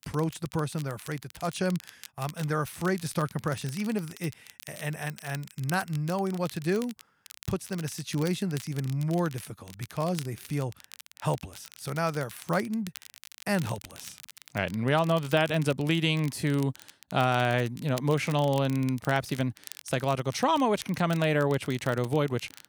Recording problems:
crackle, like an old record; noticeable; 20 dB below the speech

